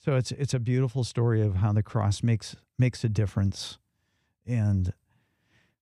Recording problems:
none

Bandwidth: 15 kHz